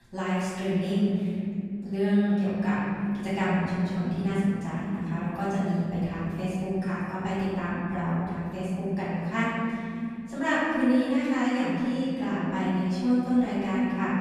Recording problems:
room echo; strong; dies away in 2.7 s
off-mic speech; far

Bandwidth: 15 kHz